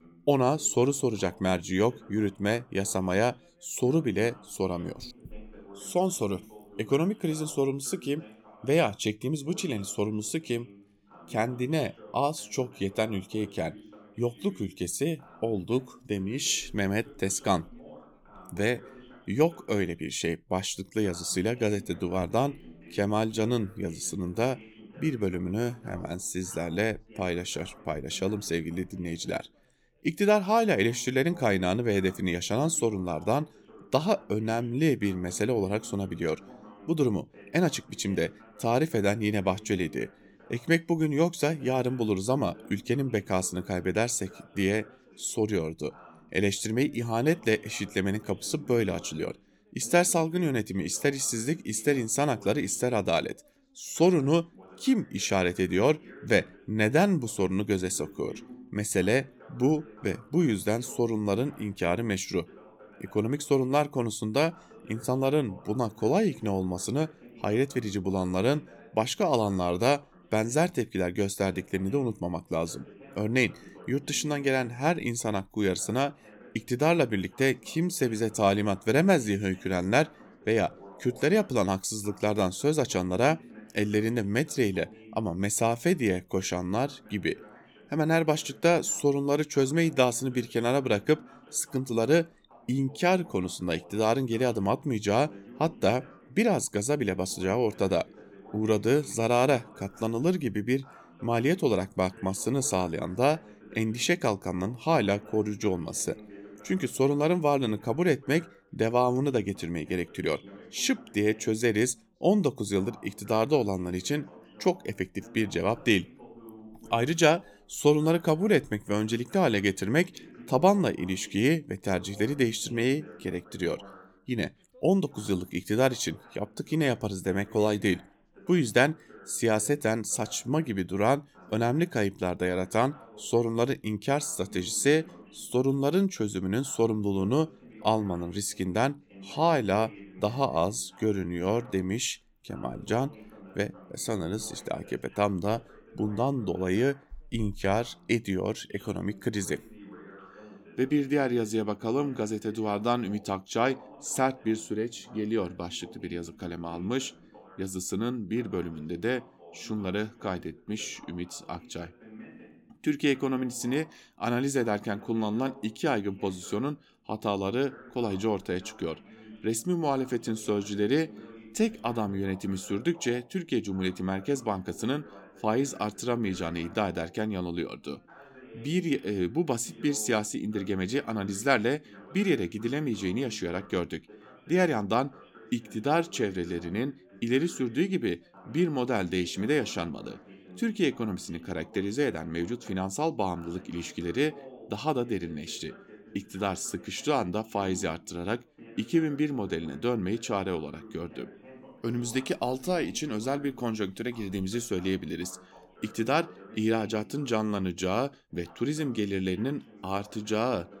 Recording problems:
background chatter; faint; throughout; 2 voices, 20 dB below the speech

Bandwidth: 17.5 kHz